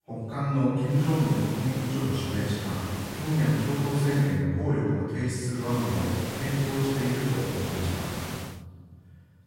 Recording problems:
room echo; strong; dies away in 2 s
off-mic speech; far
hiss; very faint; from 1 to 4.5 s and from 5.5 to 8.5 s; 8 dB below the speech

